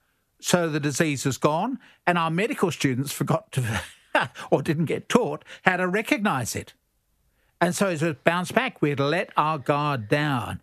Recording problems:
squashed, flat; somewhat

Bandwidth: 14 kHz